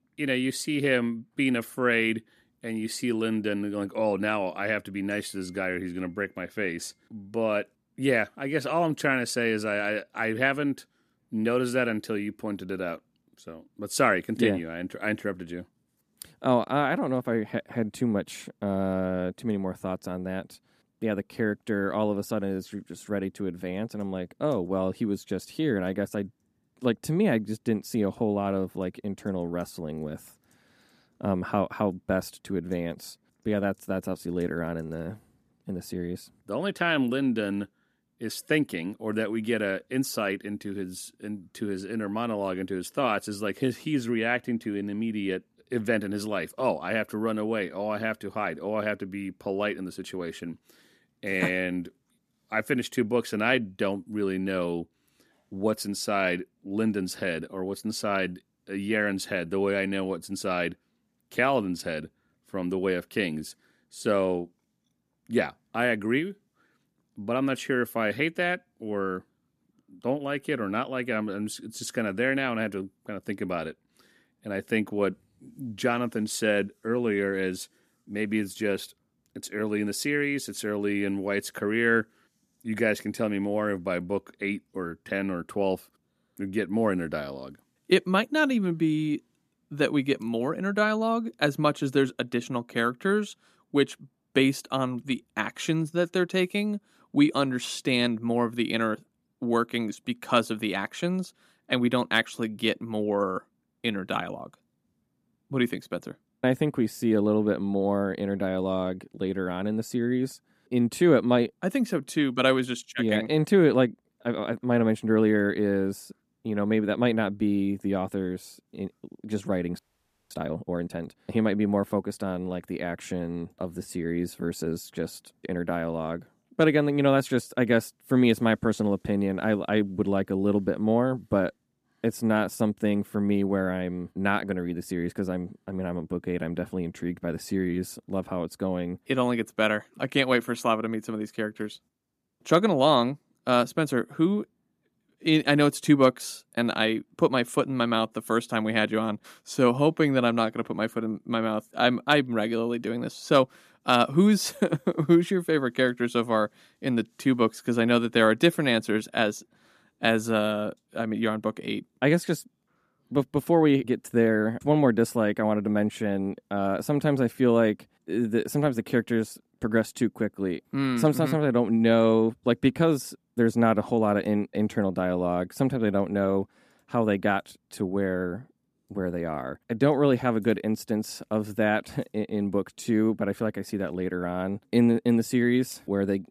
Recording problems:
audio freezing; at 2:00 for 0.5 s

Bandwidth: 14.5 kHz